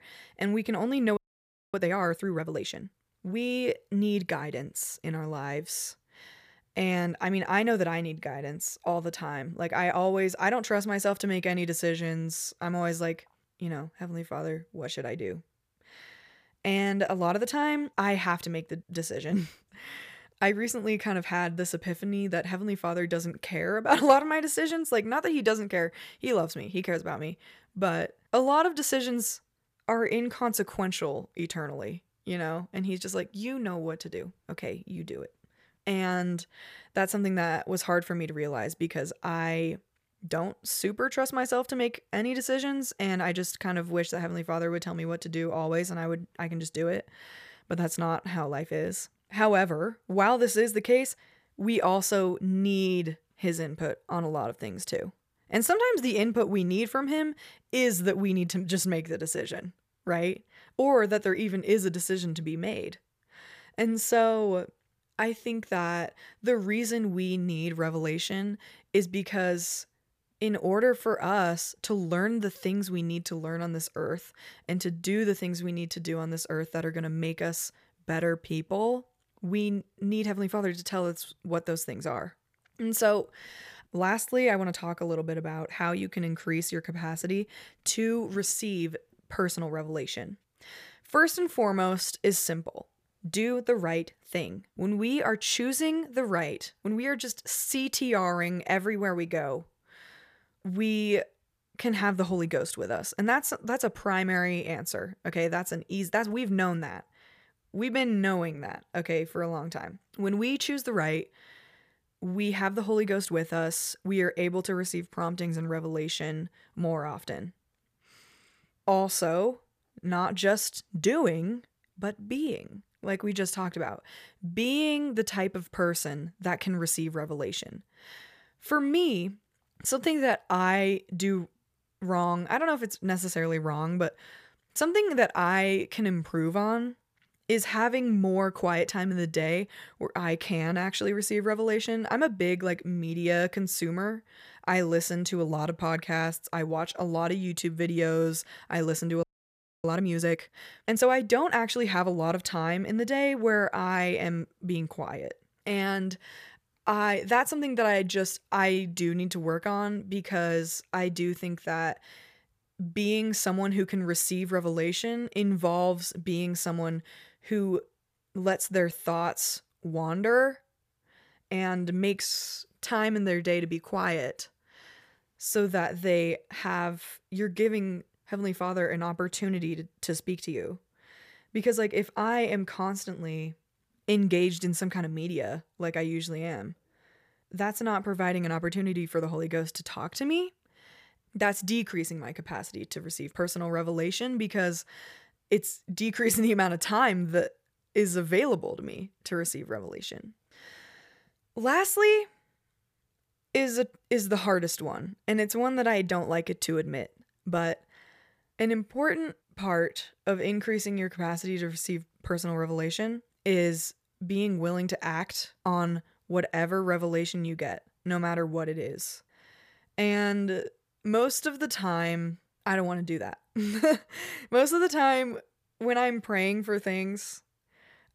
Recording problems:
audio freezing; at 1 s for 0.5 s and at 2:29 for 0.5 s

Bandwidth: 15 kHz